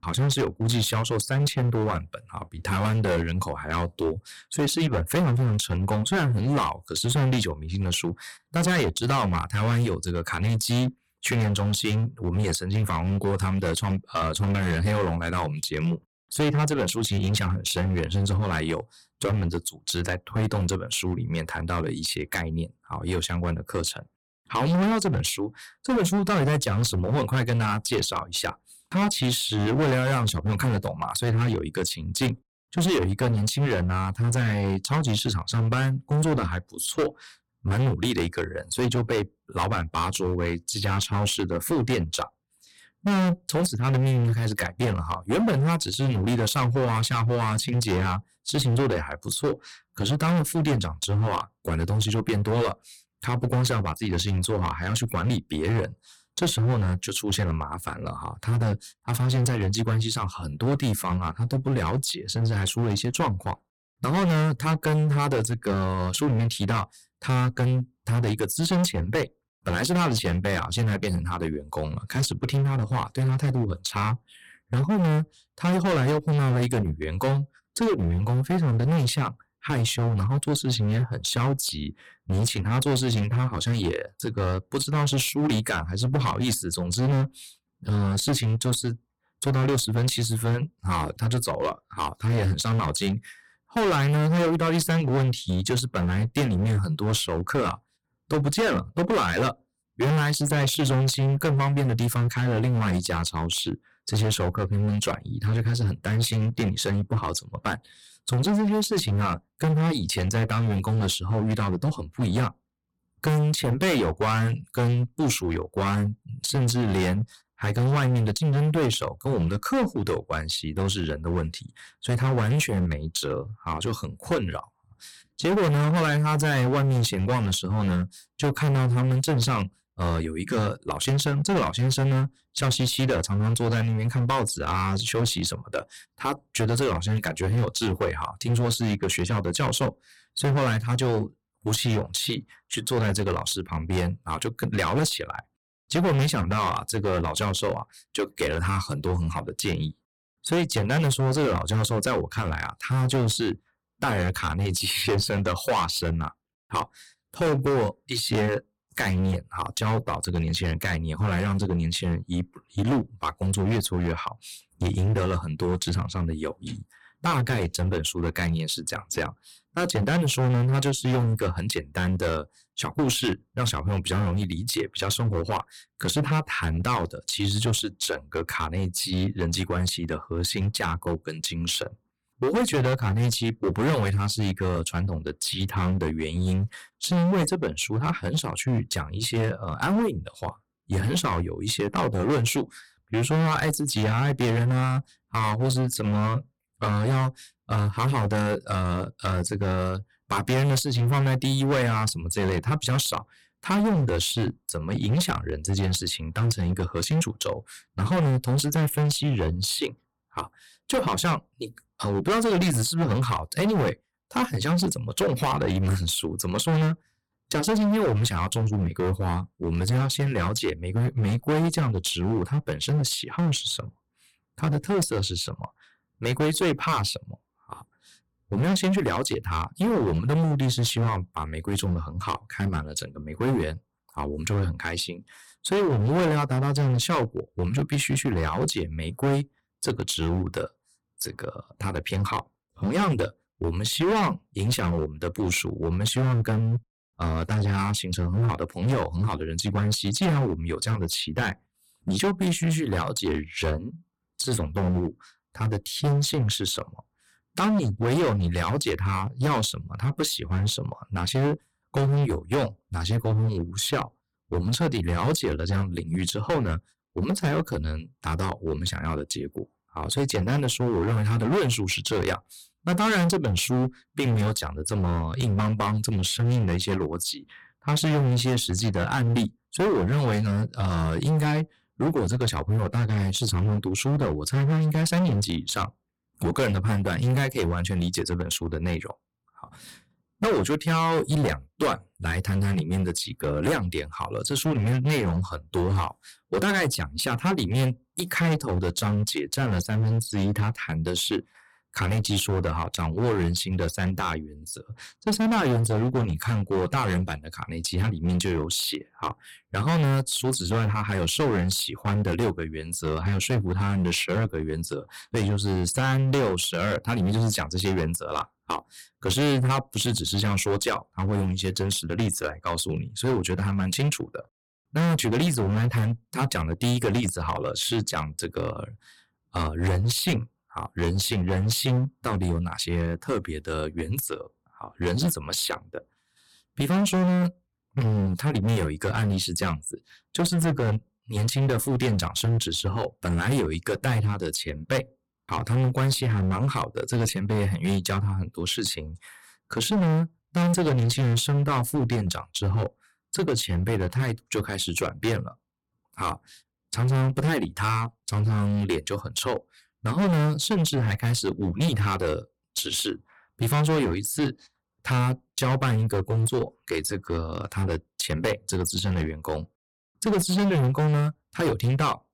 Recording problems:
distortion; heavy; 17% of the sound clipped

